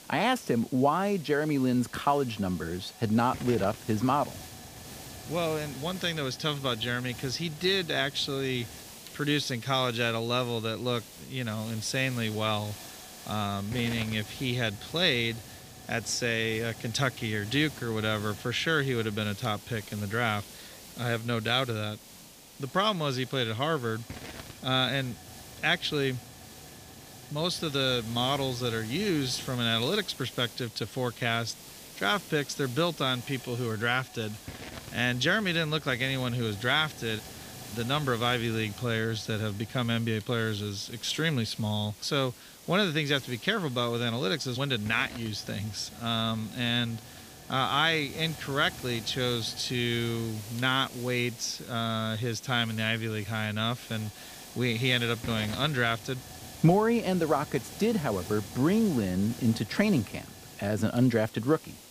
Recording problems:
hiss; noticeable; throughout; 15 dB below the speech

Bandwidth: 15 kHz